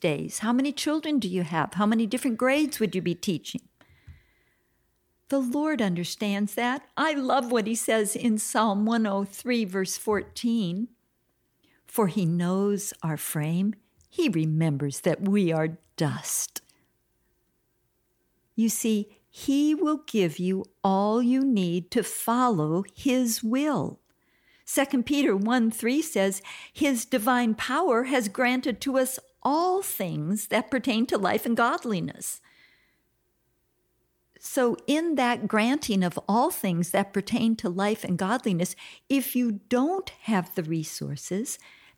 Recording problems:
none

